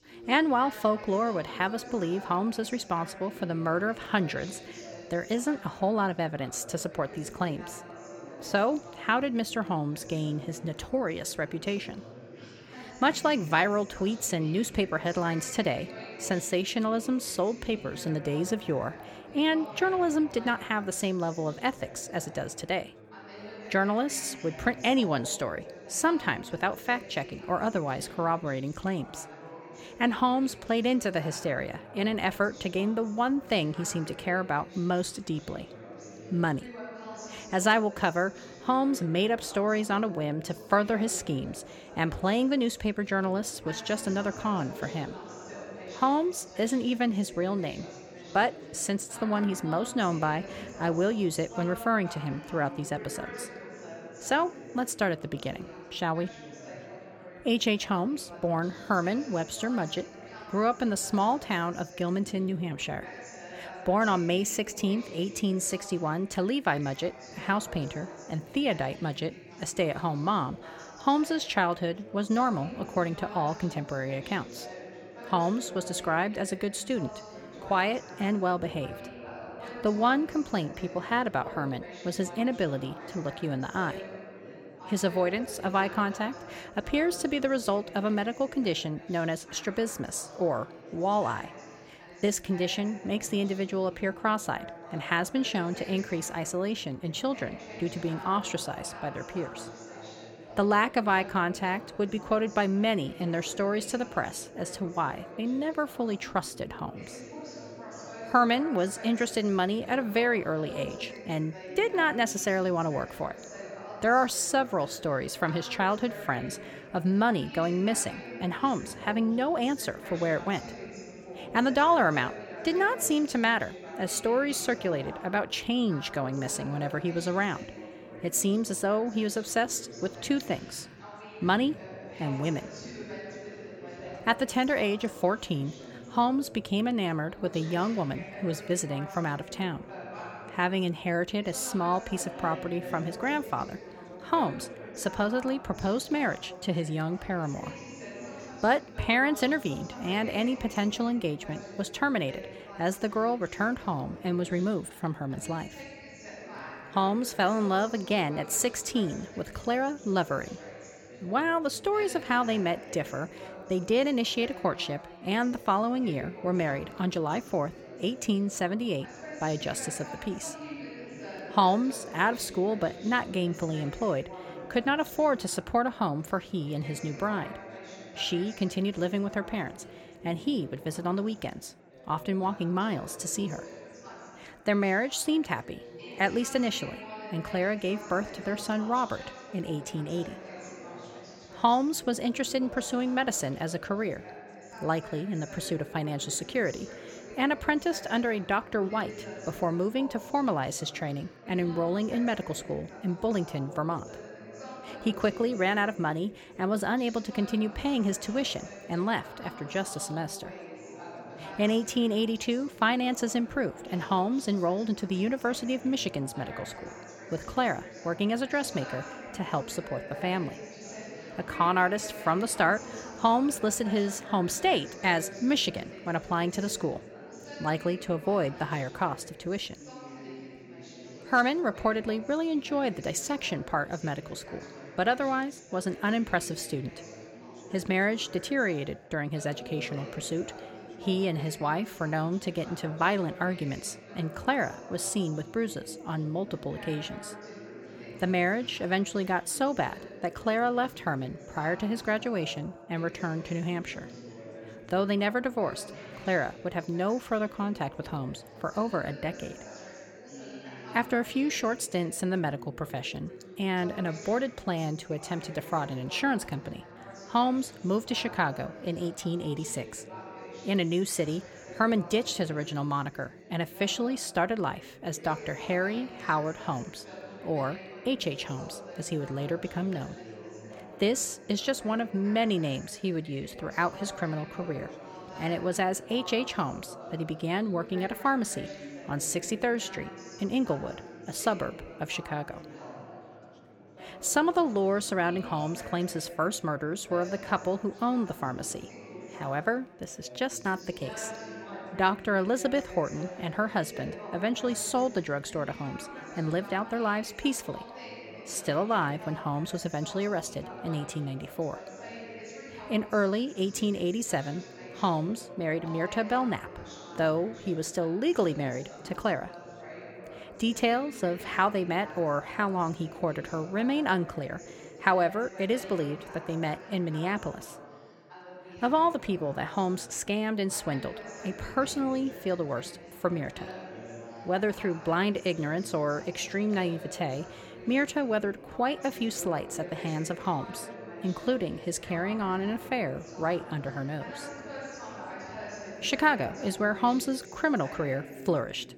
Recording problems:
background chatter; noticeable; throughout; 3 voices, 15 dB below the speech

